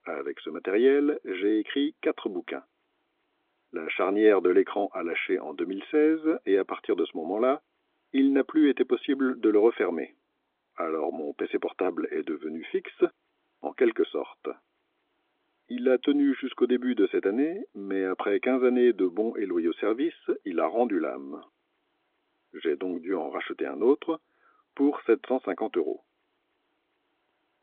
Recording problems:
phone-call audio; nothing above 3.5 kHz

